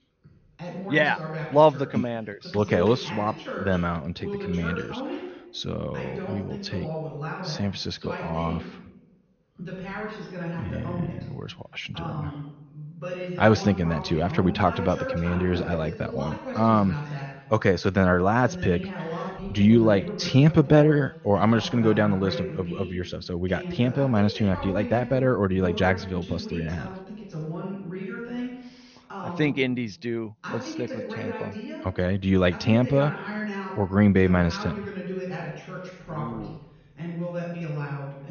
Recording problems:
high frequencies cut off; noticeable; nothing above 6.5 kHz
voice in the background; noticeable; throughout; 10 dB below the speech

